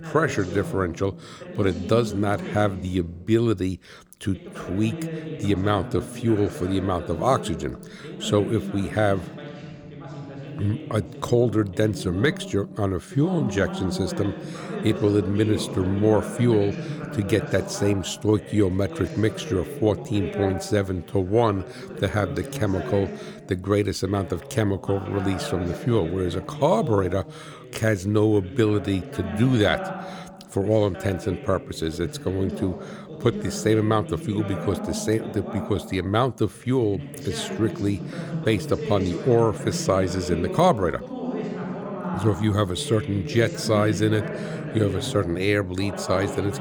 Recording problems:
voice in the background; loud; throughout; 9 dB below the speech

